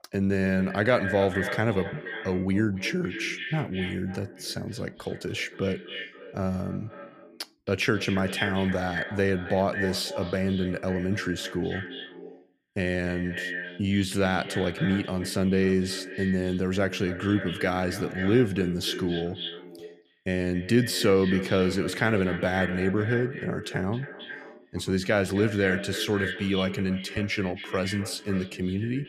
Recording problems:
echo of what is said; strong; throughout; 270 ms later, 9 dB below the speech

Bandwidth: 15 kHz